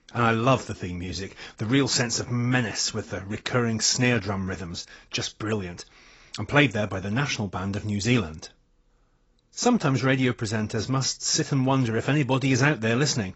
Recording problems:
garbled, watery; badly; nothing above 7.5 kHz

